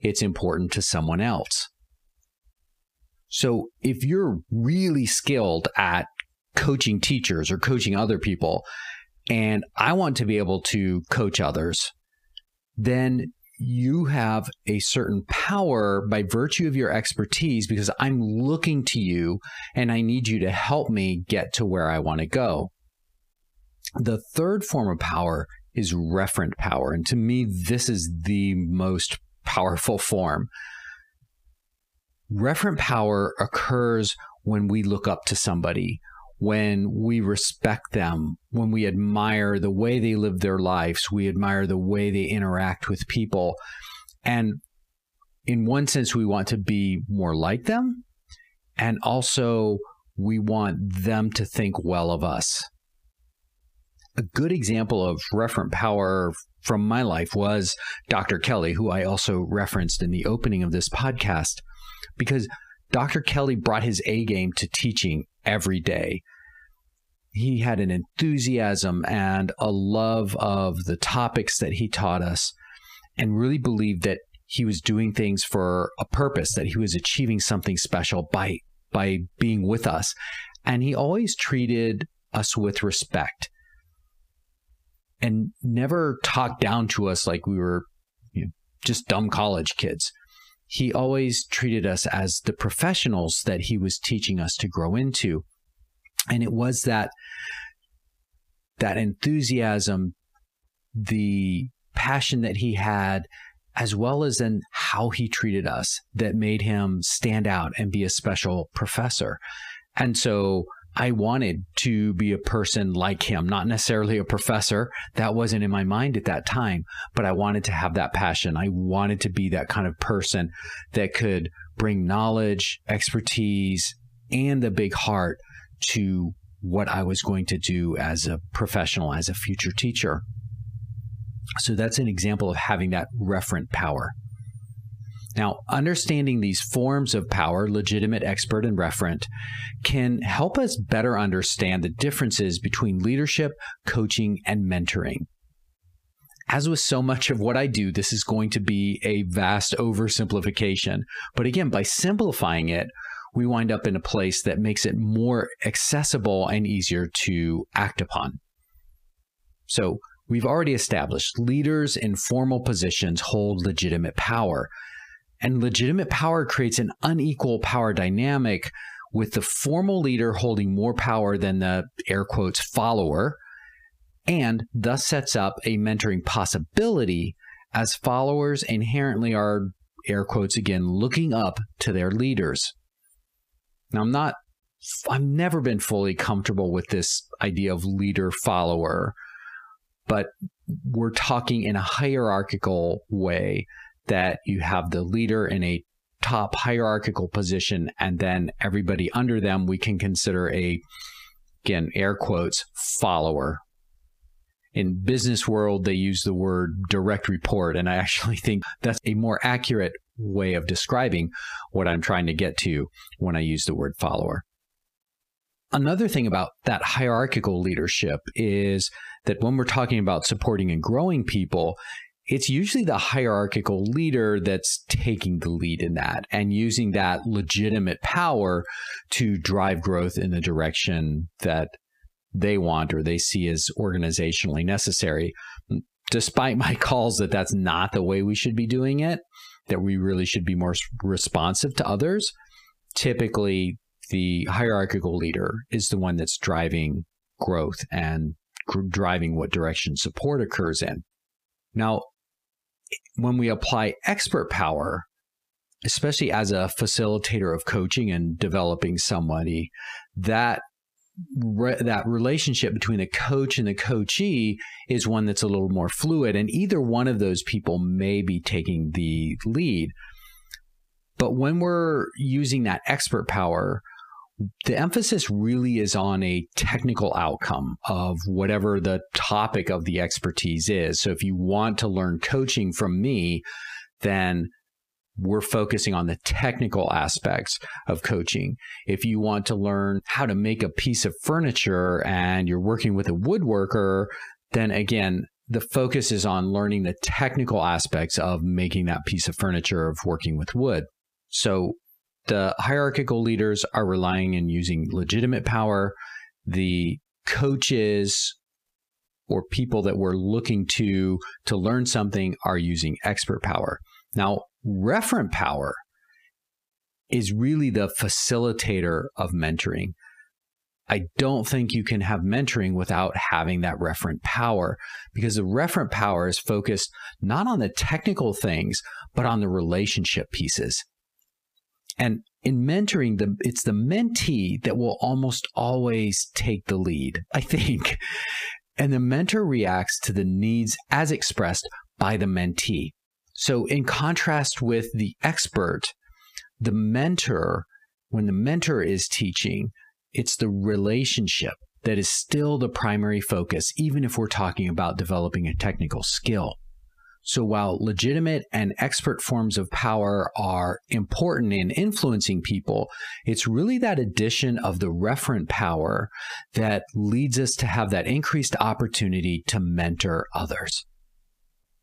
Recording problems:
squashed, flat; heavily

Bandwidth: 15 kHz